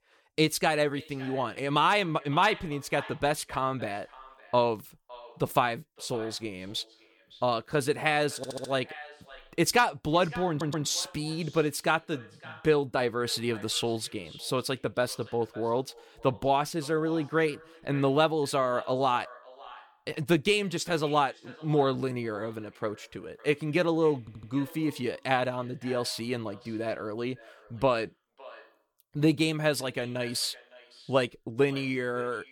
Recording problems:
echo of what is said; faint; throughout; 560 ms later, 20 dB below the speech
audio stuttering; at 8.5 s, at 10 s and at 24 s

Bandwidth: 18.5 kHz